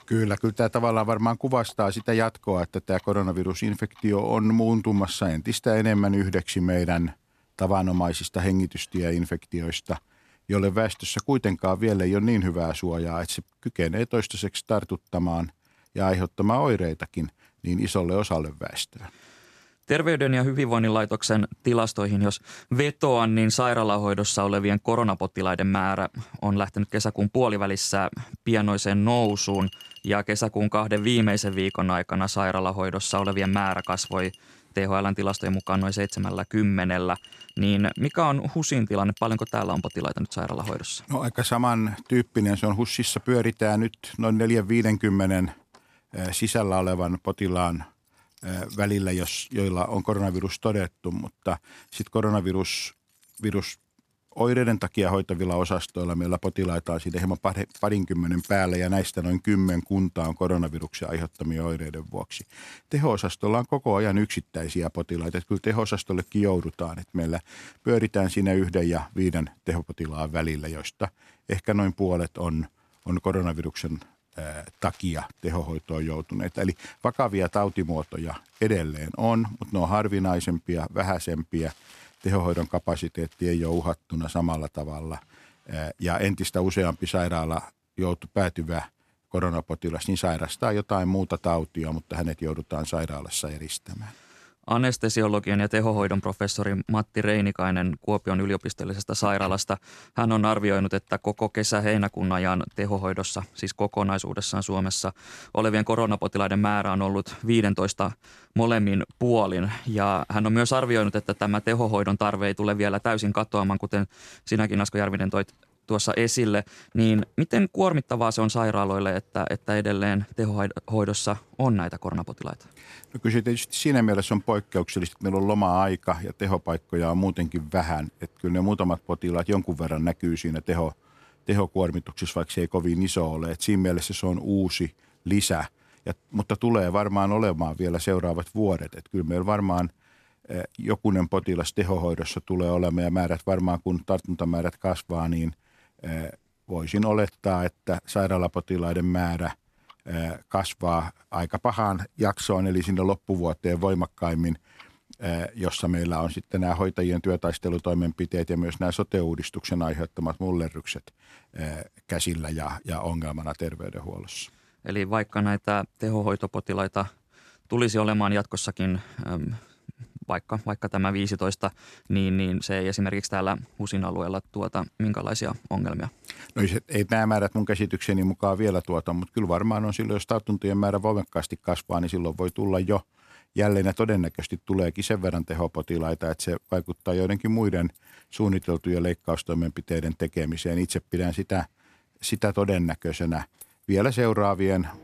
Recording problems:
household noises; faint; throughout; 25 dB below the speech

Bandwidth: 14 kHz